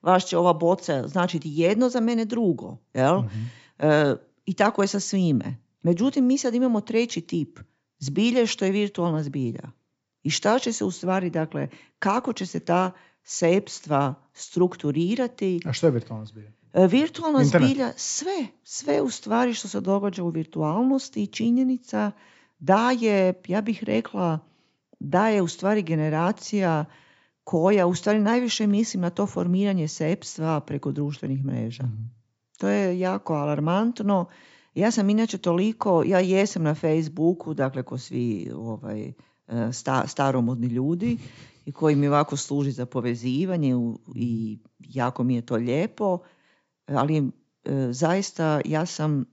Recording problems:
high frequencies cut off; noticeable; nothing above 8 kHz

